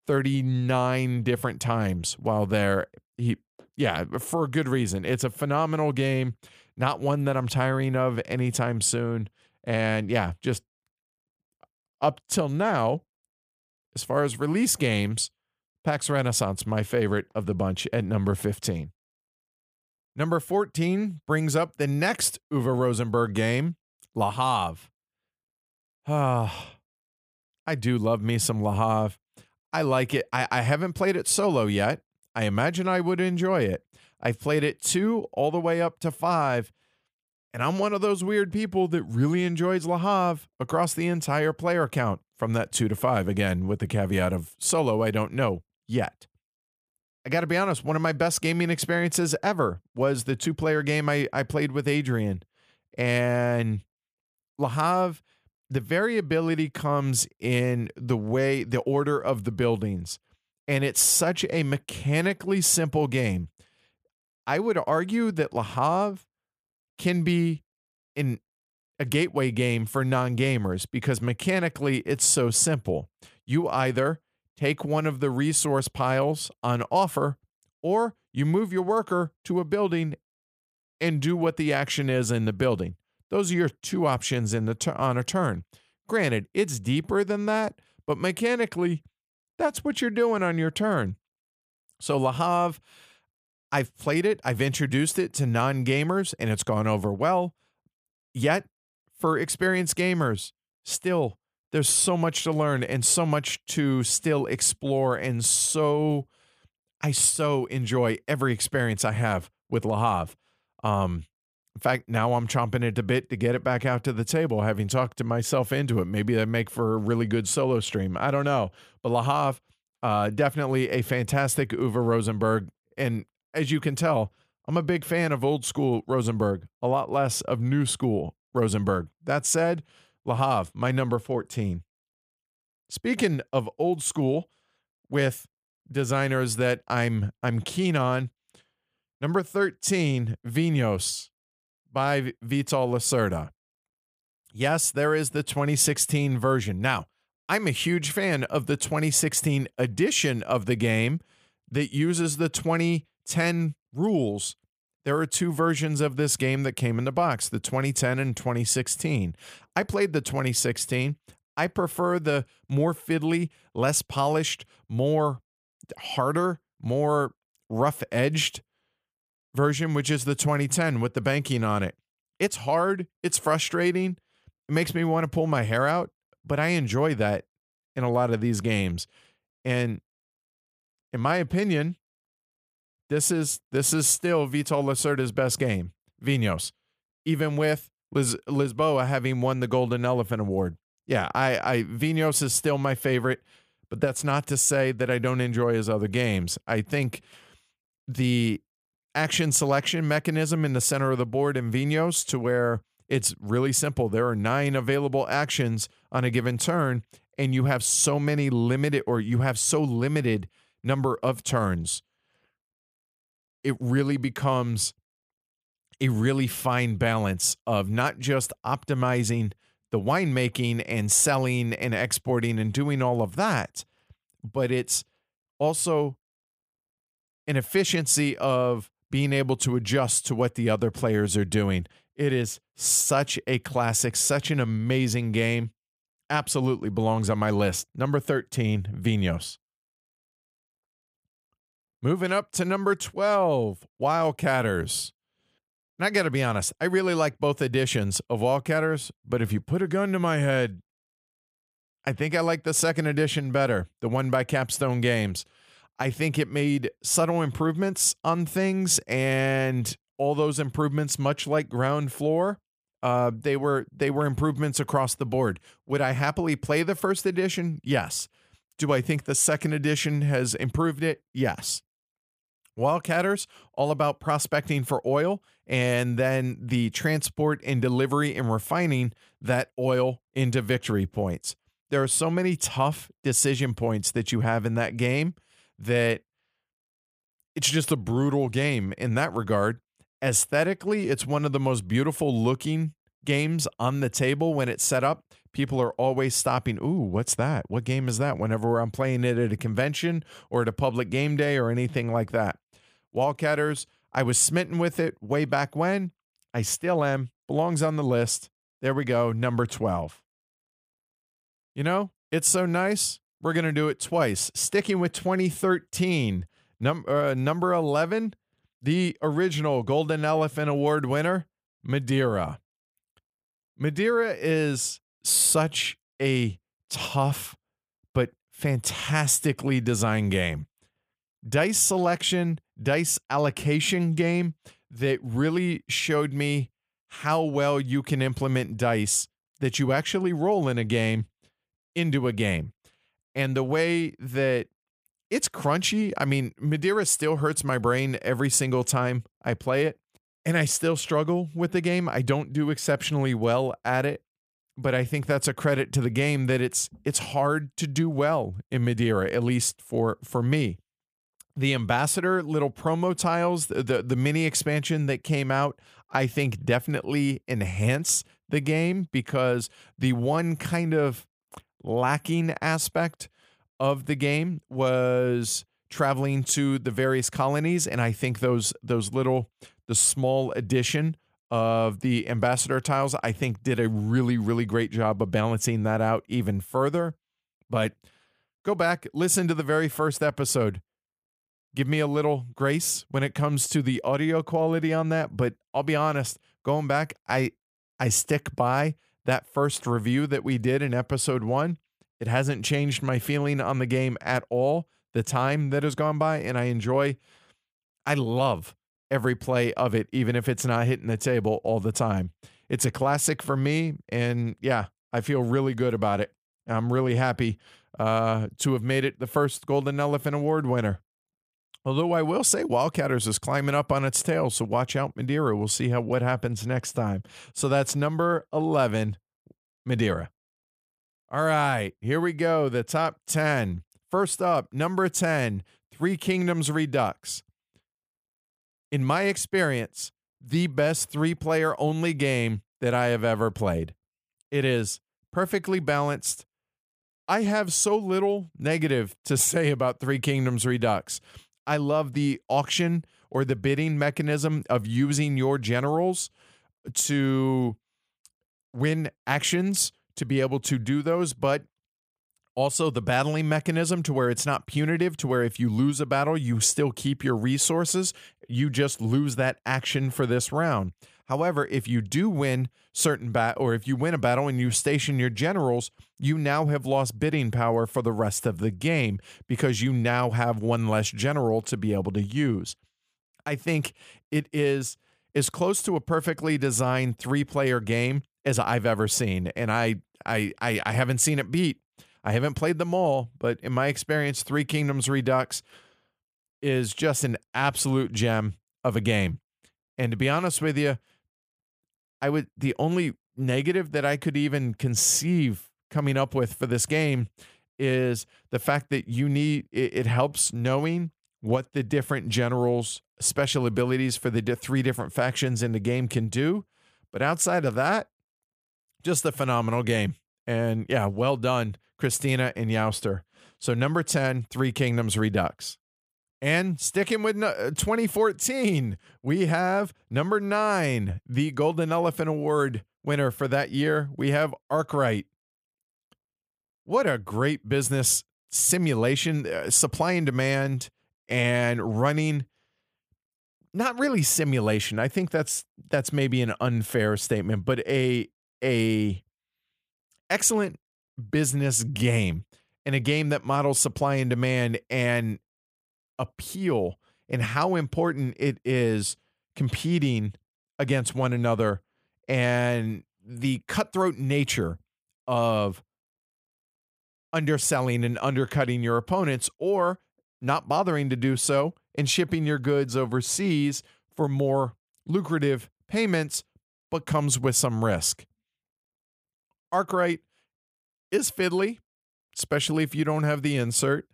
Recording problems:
none

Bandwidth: 15 kHz